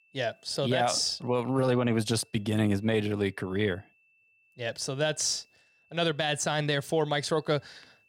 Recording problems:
high-pitched whine; faint; throughout; 2.5 kHz, 35 dB below the speech

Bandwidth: 17 kHz